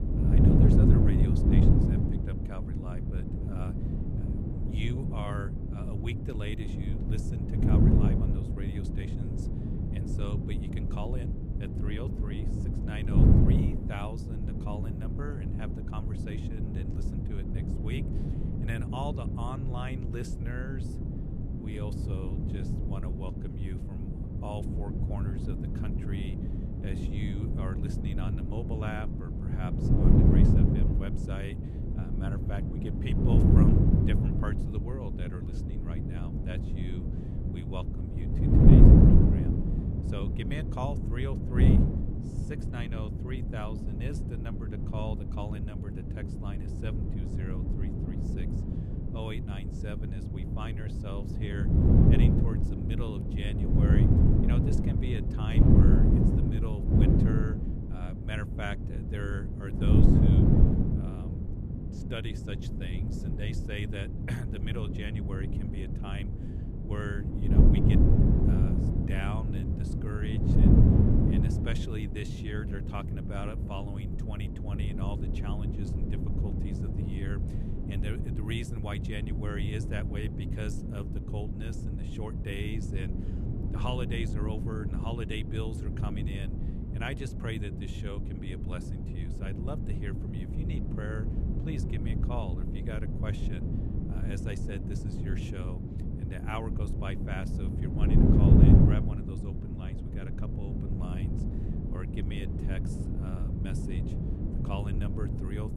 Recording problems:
wind noise on the microphone; heavy; 4 dB above the speech

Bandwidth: 13.5 kHz